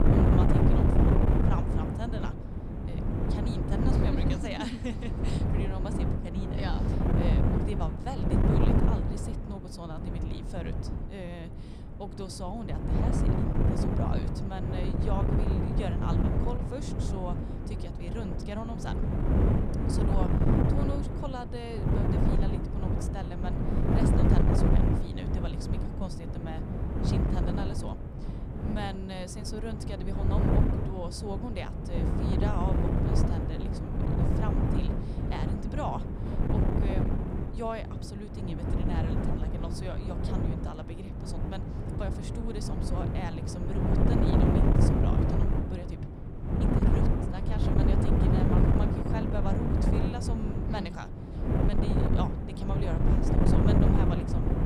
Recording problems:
wind noise on the microphone; heavy; 4 dB above the speech

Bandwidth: 15.5 kHz